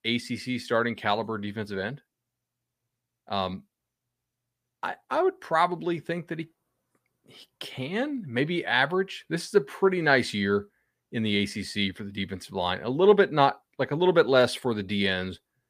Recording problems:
none

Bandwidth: 15 kHz